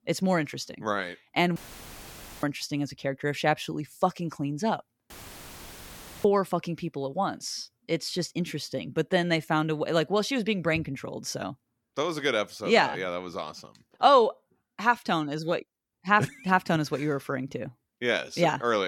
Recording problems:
audio cutting out; filled with static; at 1.5 s for 1 s and at 5 s for 1 s
abrupt cut into speech; at the end

